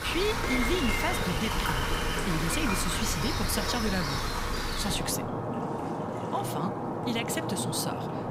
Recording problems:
rain or running water; very loud; throughout; 1 dB above the speech
hiss; very faint; from 1.5 to 4 s and from 4.5 s on; 25 dB below the speech

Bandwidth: 15.5 kHz